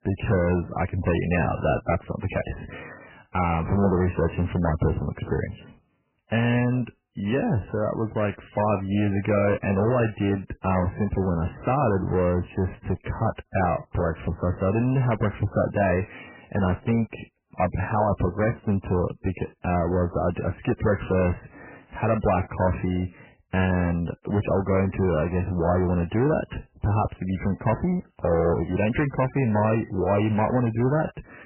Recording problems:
garbled, watery; badly; nothing above 3 kHz
distortion; slight; 10 dB below the speech

